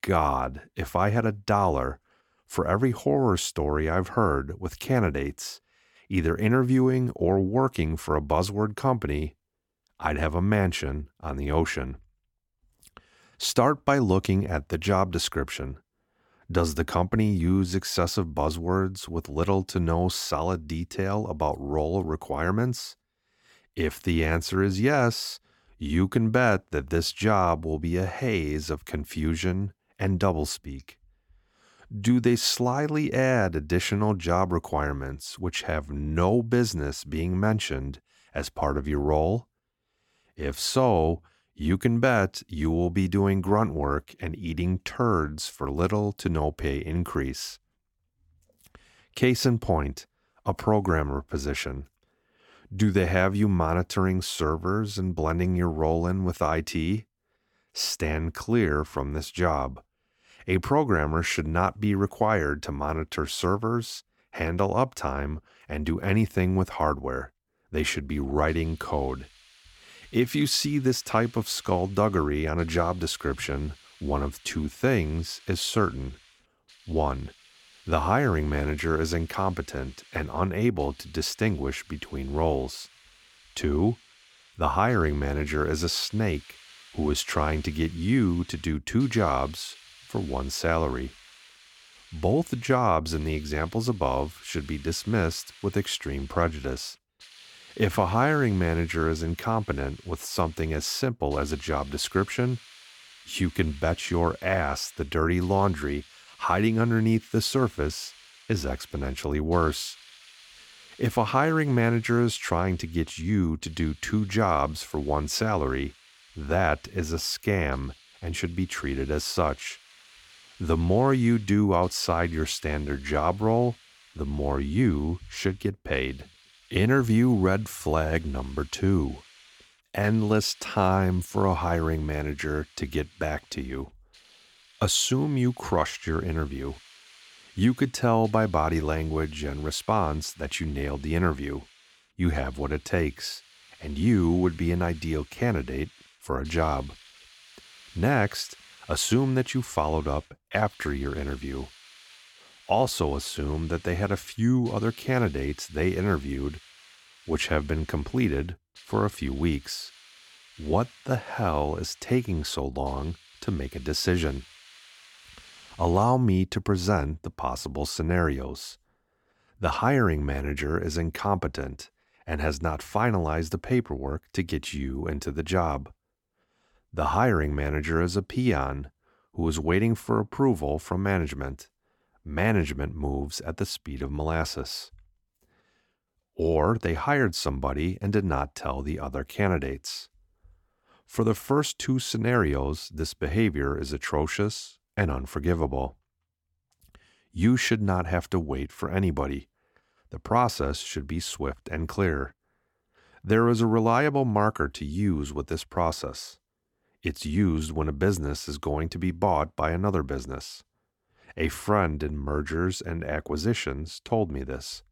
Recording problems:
hiss; faint; from 1:08 to 2:46; 25 dB below the speech

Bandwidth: 17 kHz